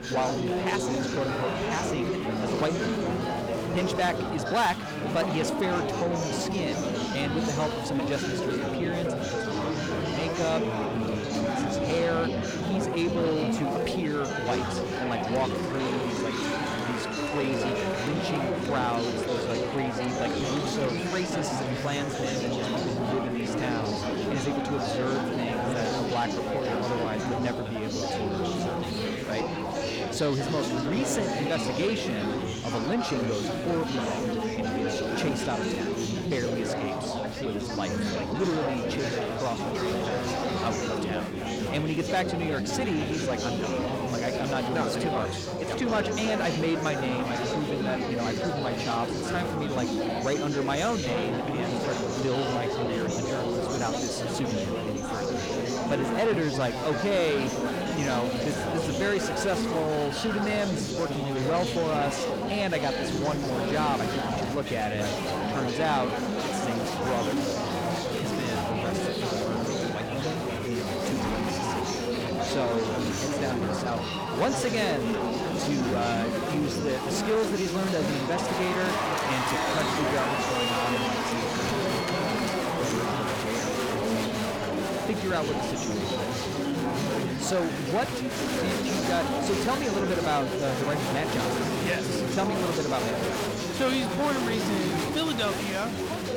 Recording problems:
distortion; slight; 10 dB below the speech
chatter from many people; very loud; throughout; 2 dB above the speech

